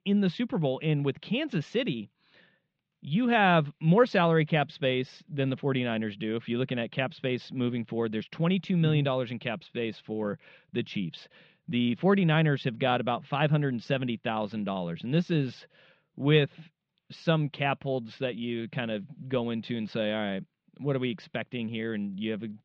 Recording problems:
muffled; very; fading above 3.5 kHz

